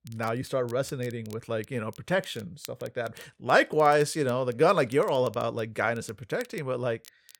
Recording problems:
crackle, like an old record; faint; 25 dB below the speech

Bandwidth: 17 kHz